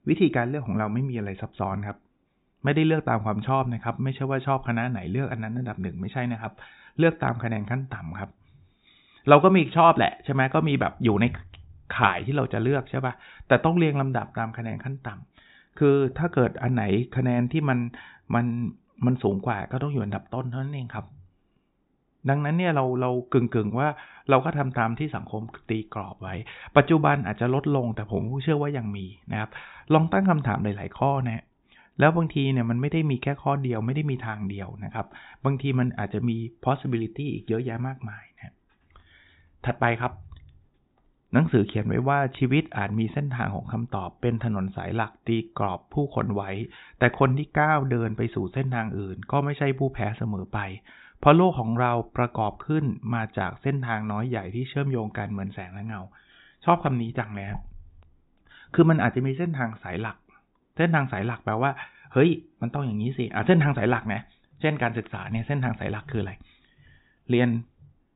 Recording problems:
high frequencies cut off; severe; nothing above 4 kHz

